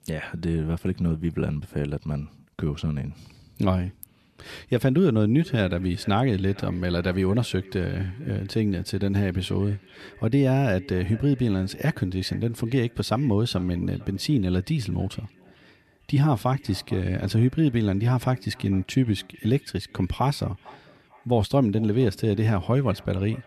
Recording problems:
echo of what is said; faint; from 5.5 s on; 450 ms later, 25 dB below the speech

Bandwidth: 13.5 kHz